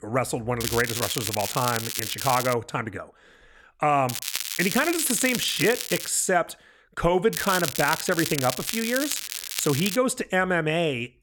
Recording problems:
crackling; loud; from 0.5 to 2.5 s, from 4 to 6 s and from 7.5 to 10 s; 4 dB below the speech

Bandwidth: 18 kHz